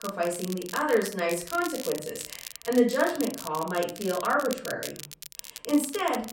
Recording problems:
off-mic speech; far
room echo; slight; dies away in 0.4 s
crackle, like an old record; noticeable; 10 dB below the speech

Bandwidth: 16 kHz